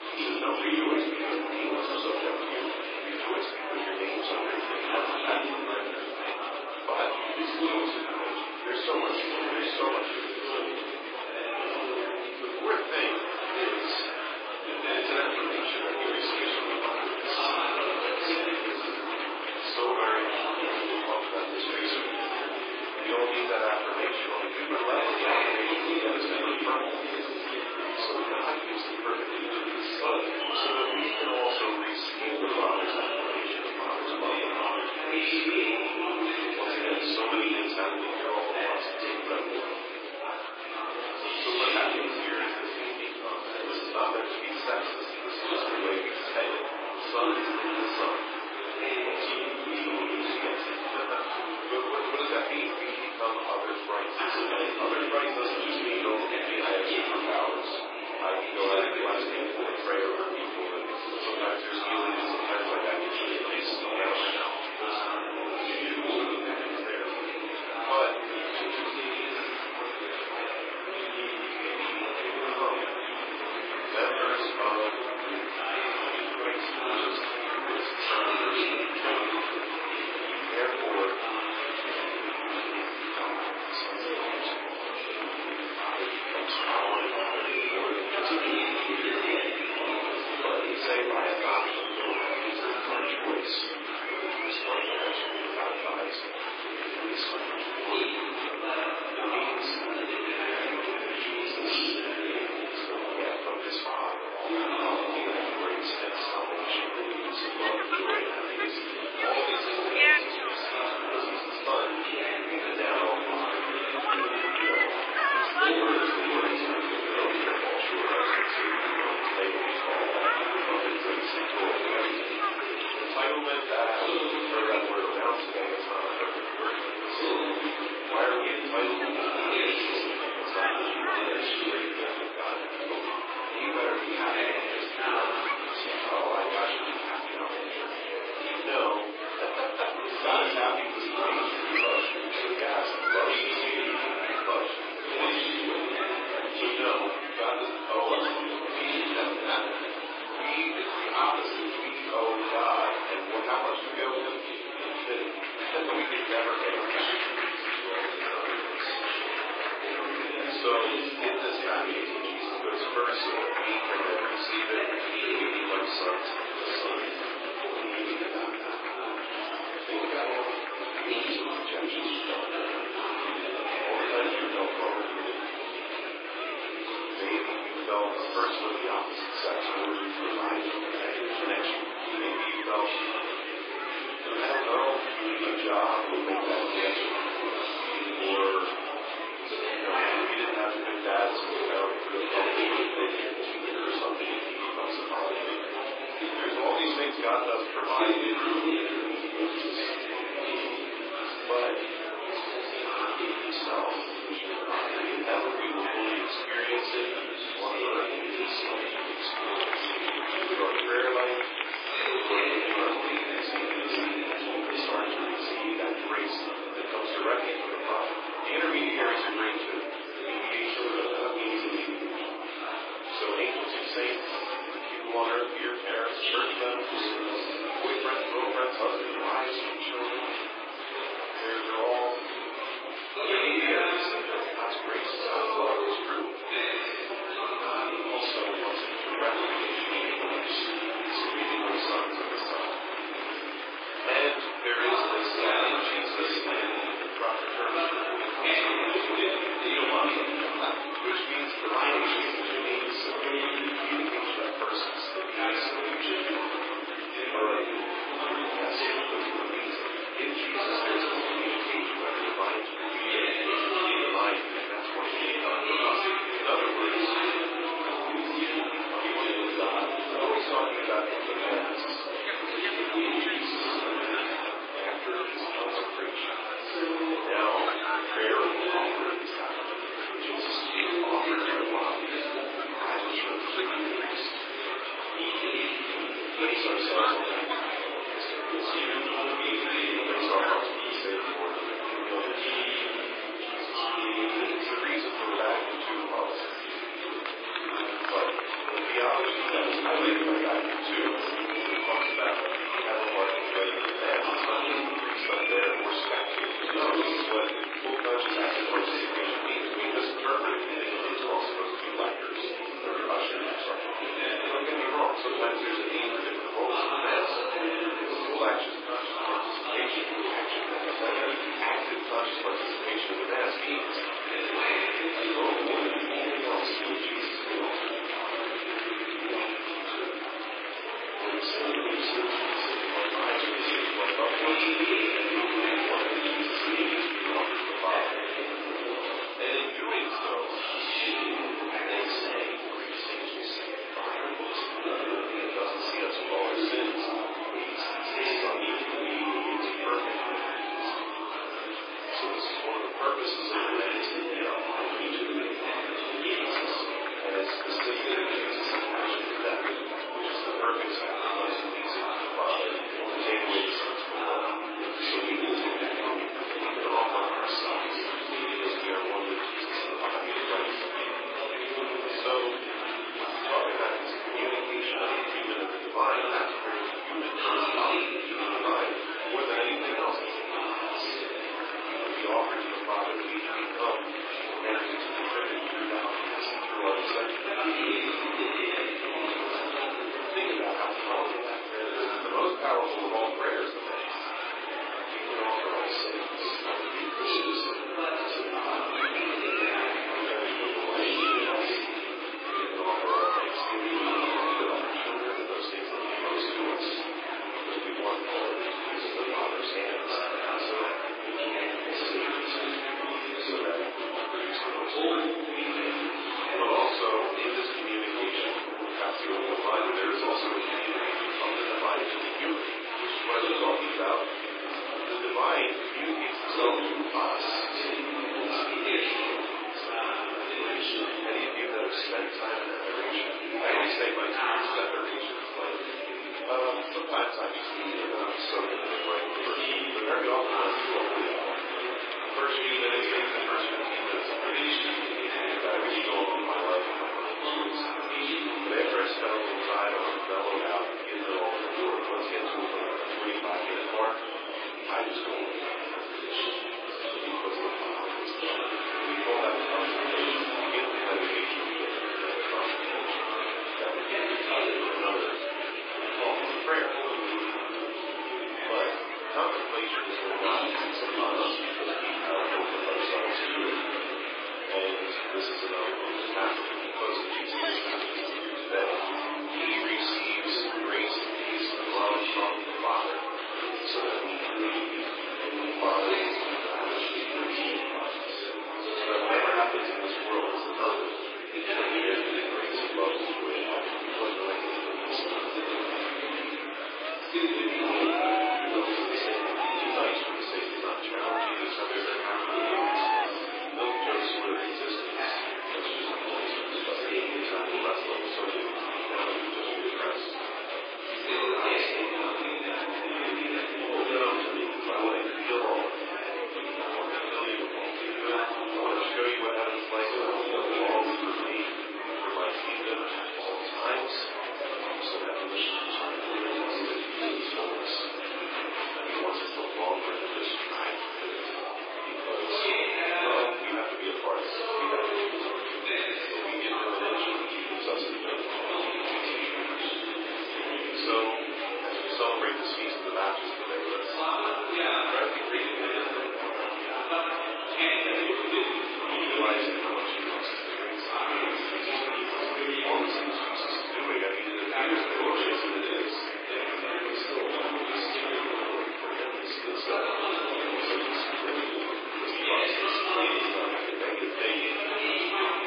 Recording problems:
off-mic speech; far
garbled, watery; badly; nothing above 5 kHz
thin; very; fading below 300 Hz
room echo; noticeable; dies away in 0.4 s
murmuring crowd; very loud; throughout; 2 dB above the speech

